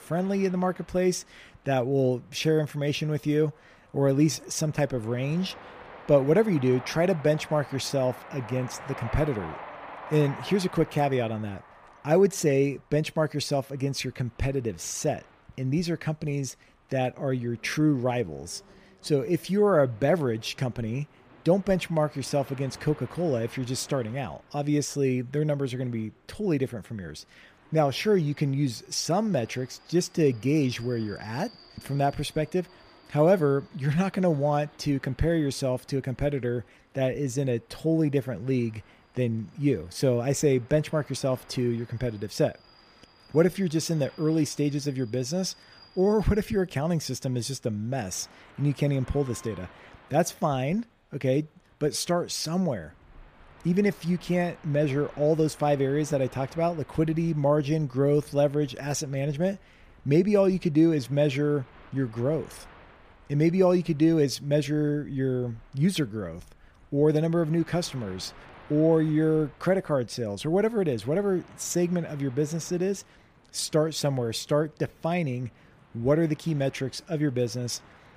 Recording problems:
train or aircraft noise; faint; throughout; 25 dB below the speech

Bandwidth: 15 kHz